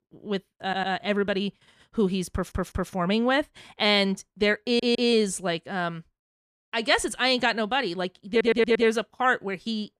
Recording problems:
audio stuttering; 4 times, first at 0.5 s

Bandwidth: 14.5 kHz